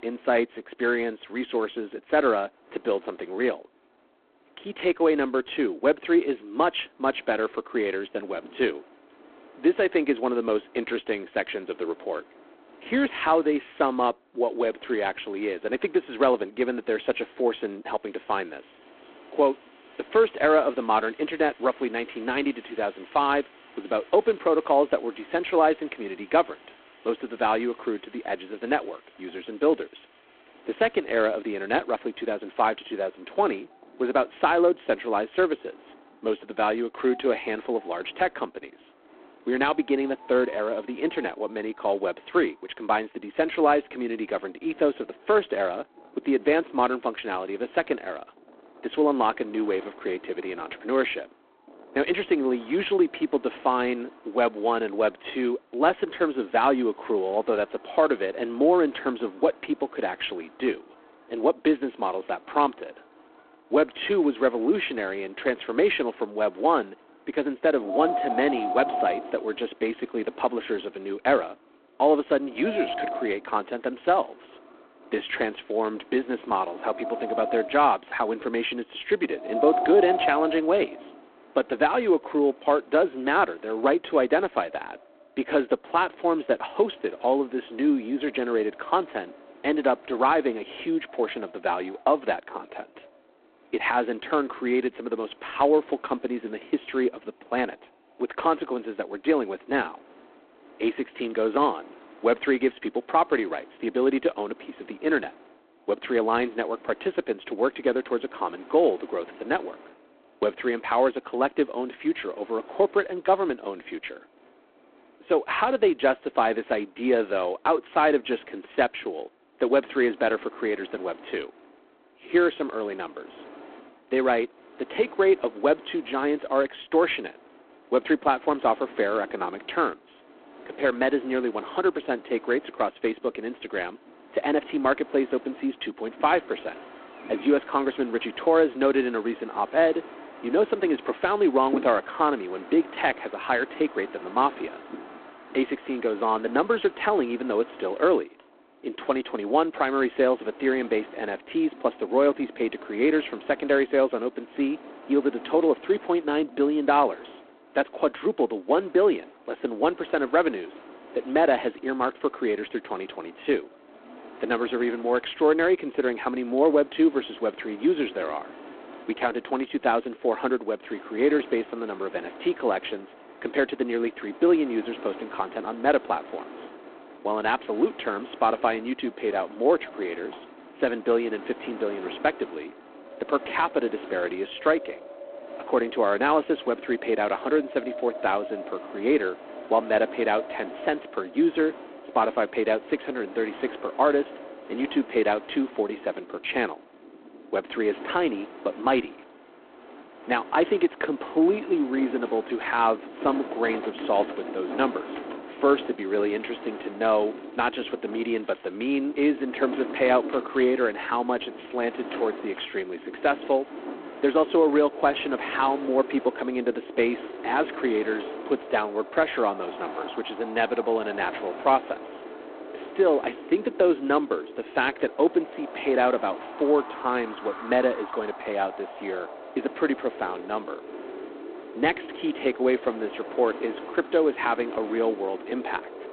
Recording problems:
phone-call audio; poor line; nothing above 3.5 kHz
wind in the background; noticeable; throughout; 15 dB below the speech

